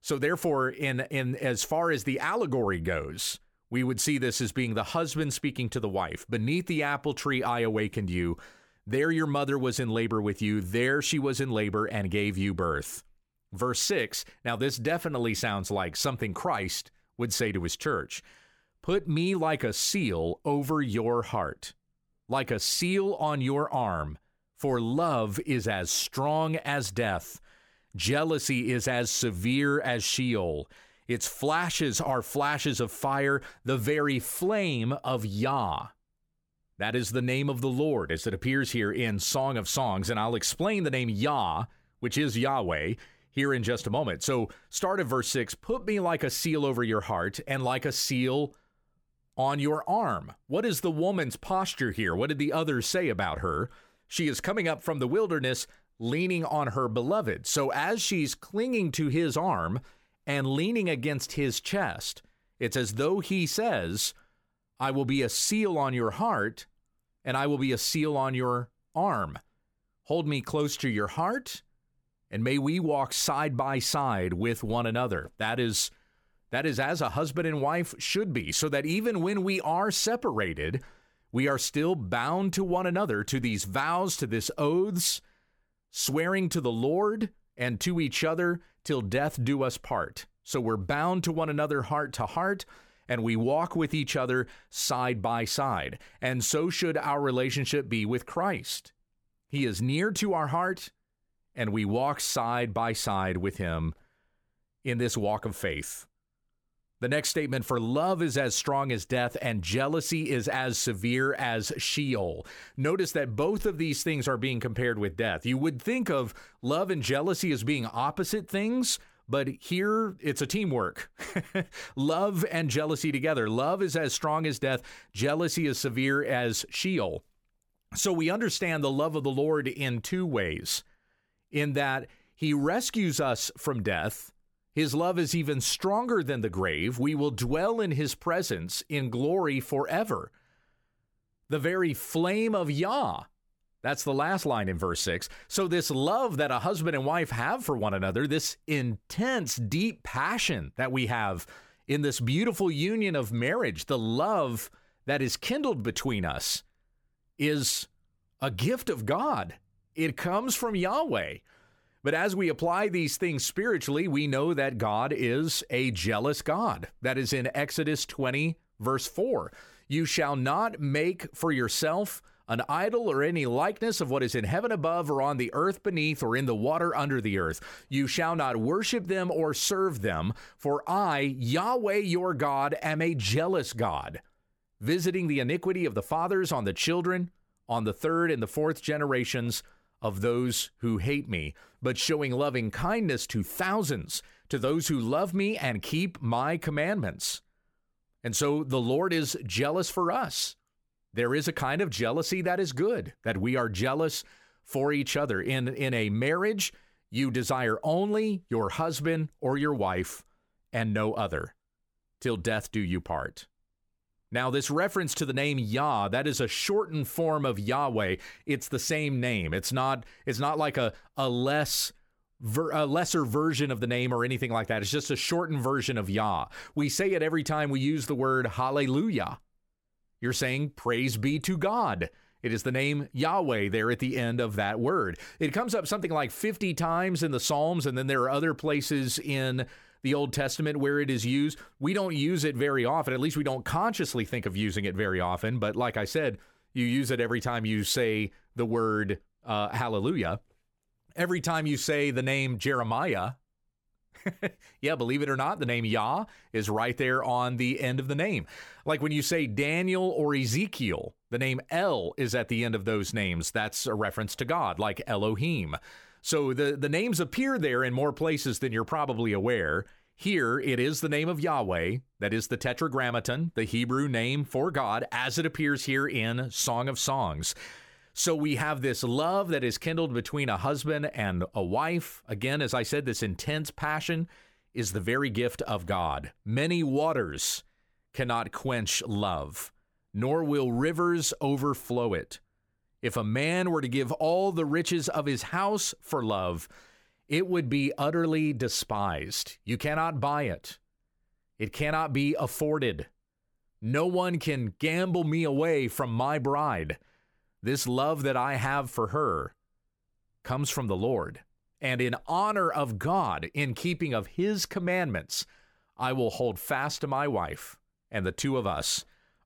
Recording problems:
none

